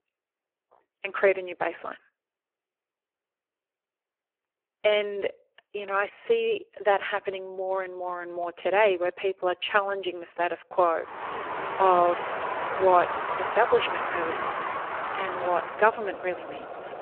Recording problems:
phone-call audio; poor line
traffic noise; loud; from 11 s on; 5 dB below the speech

